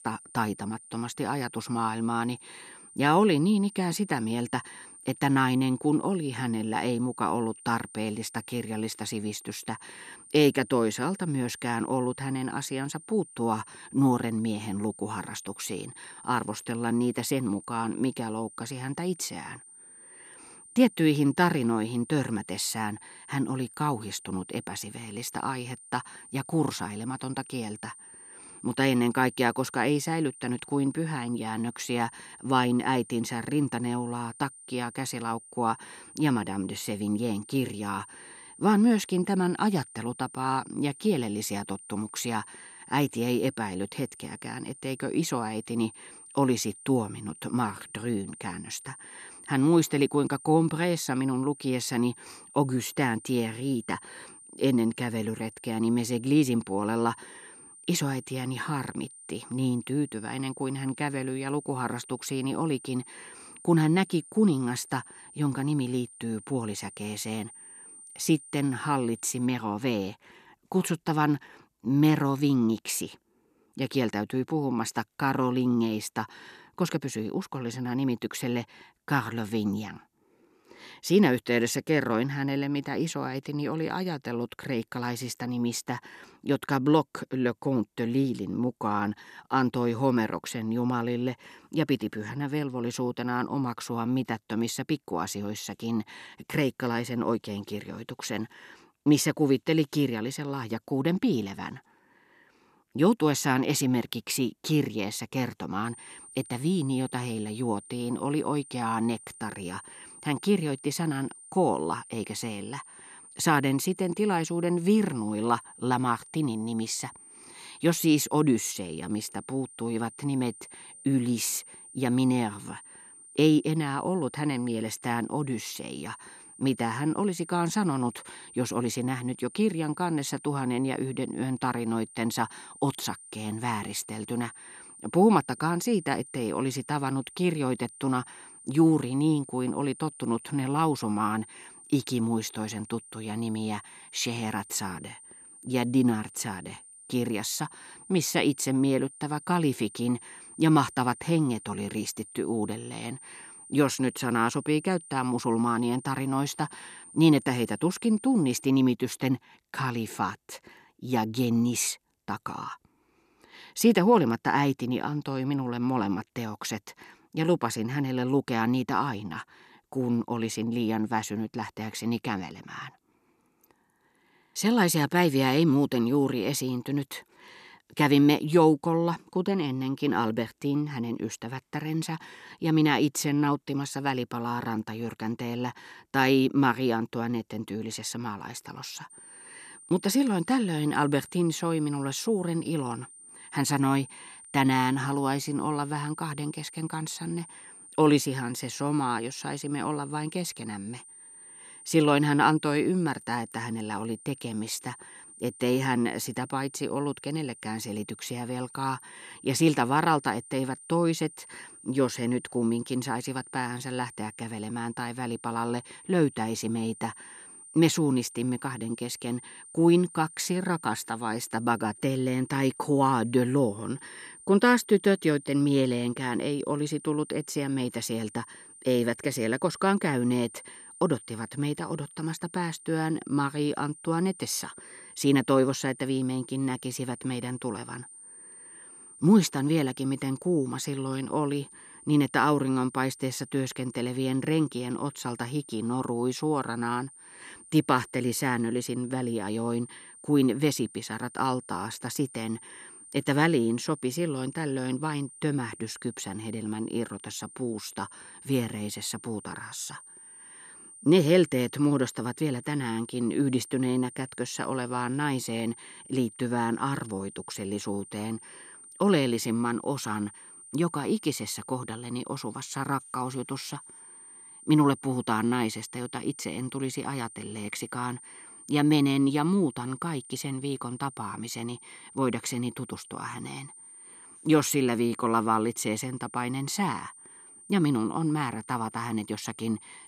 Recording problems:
high-pitched whine; noticeable; until 1:09, from 1:46 to 2:39 and from 3:09 on; 9 kHz, 20 dB below the speech

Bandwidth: 14 kHz